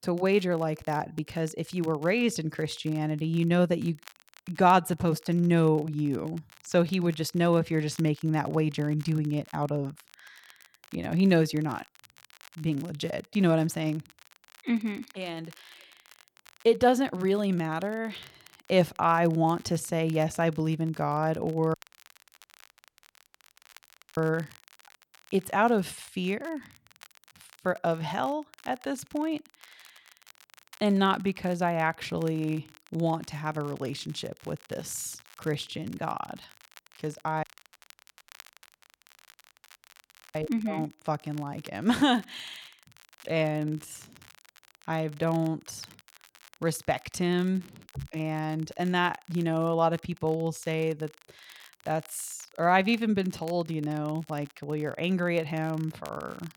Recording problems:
crackle, like an old record; faint; 25 dB below the speech
audio cutting out; at 22 s for 2.5 s and at 37 s for 3 s

